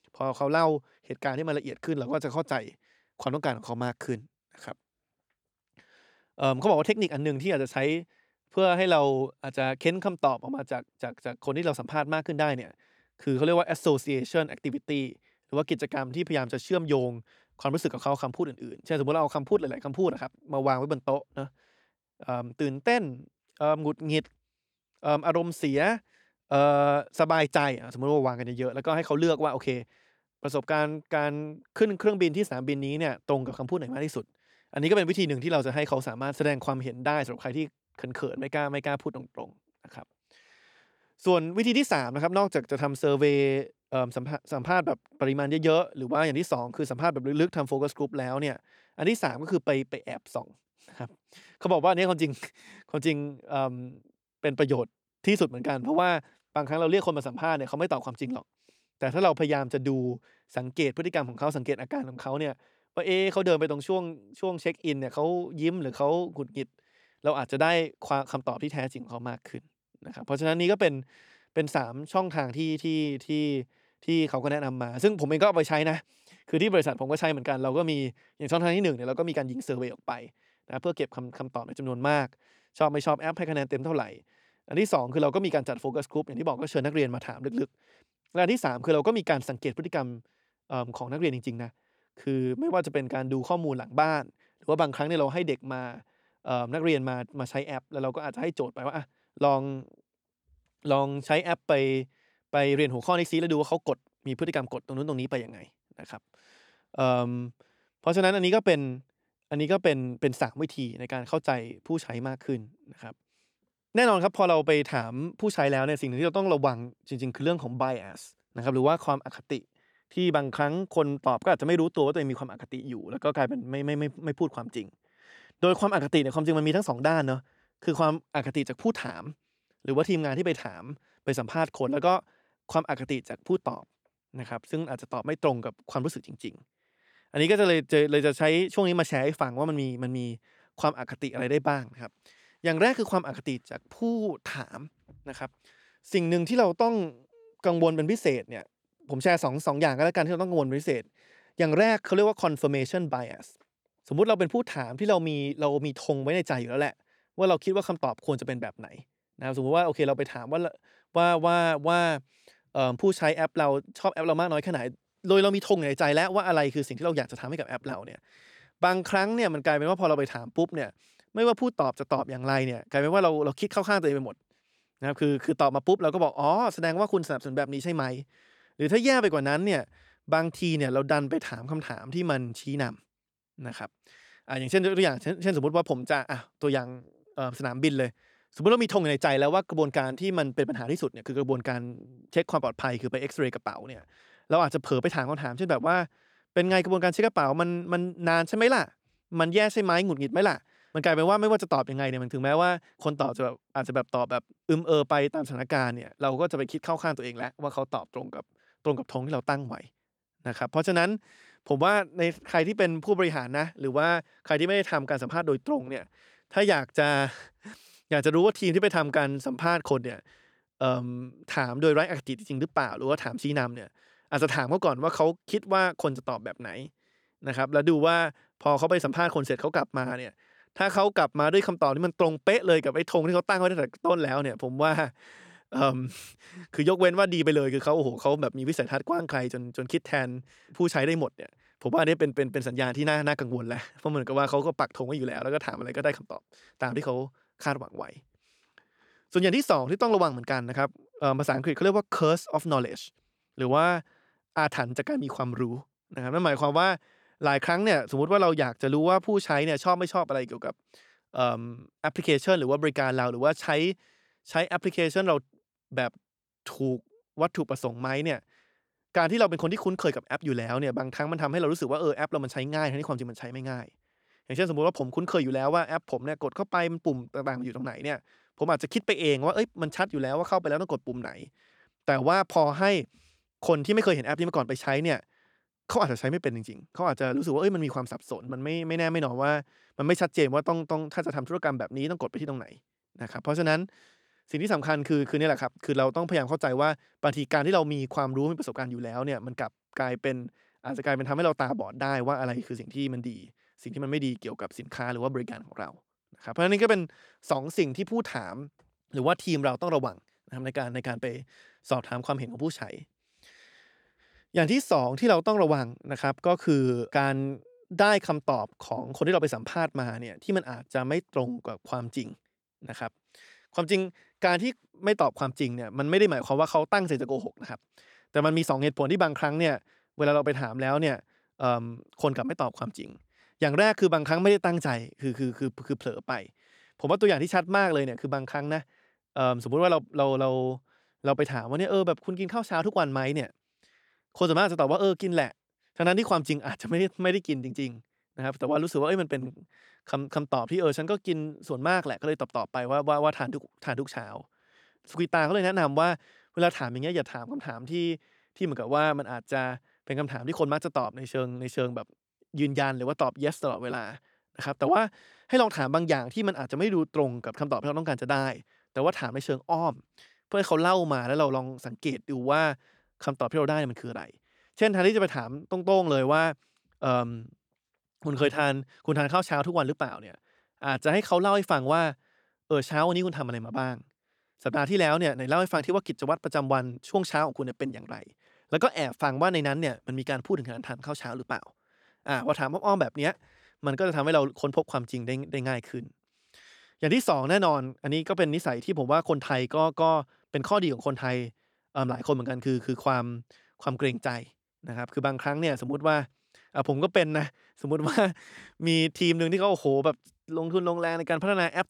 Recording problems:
none

